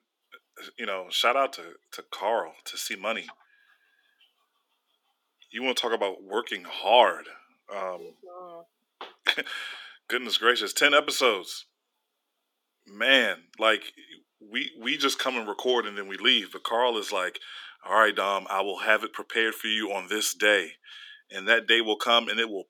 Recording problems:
thin; somewhat; fading below 350 Hz

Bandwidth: 18 kHz